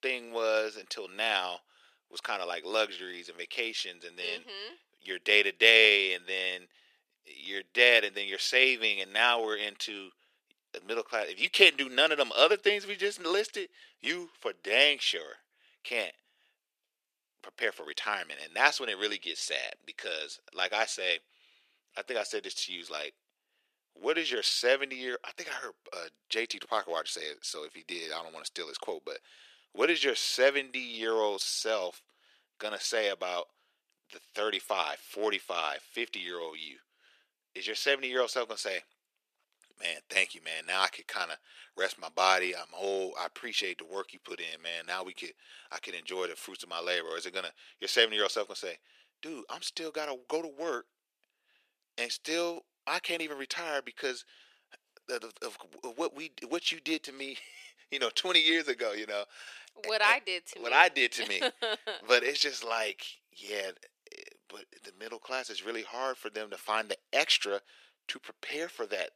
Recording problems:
thin; very; fading below 400 Hz

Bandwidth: 14.5 kHz